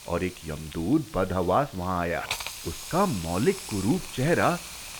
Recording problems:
high frequencies cut off; severe; nothing above 4 kHz
hiss; noticeable; throughout; 10 dB below the speech
crackle, like an old record; faint; 25 dB below the speech

